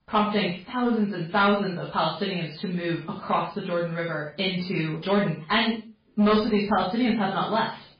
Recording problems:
off-mic speech; far
garbled, watery; badly; nothing above 4.5 kHz
room echo; noticeable; dies away in 0.4 s
distortion; slight; 10 dB below the speech

